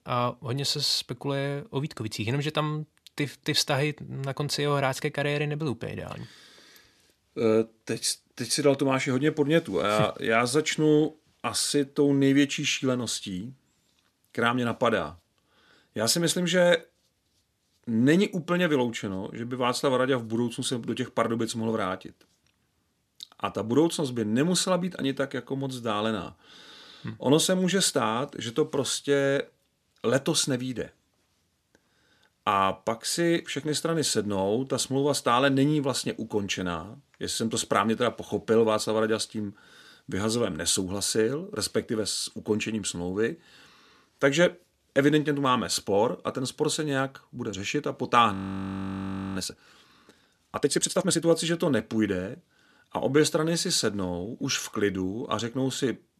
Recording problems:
audio freezing; at 48 s for 1 s

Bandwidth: 13.5 kHz